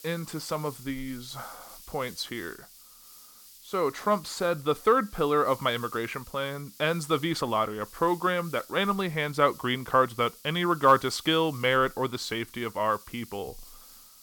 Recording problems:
hiss; noticeable; throughout; 20 dB below the speech

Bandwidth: 17 kHz